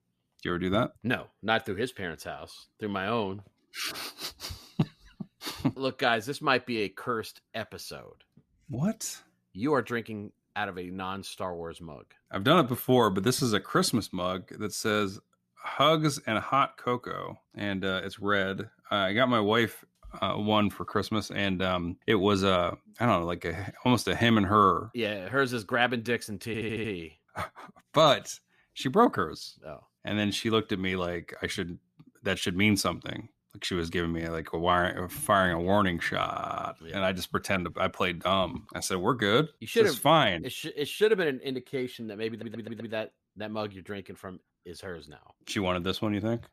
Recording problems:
audio stuttering; at 26 s, at 36 s and at 42 s

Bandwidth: 14.5 kHz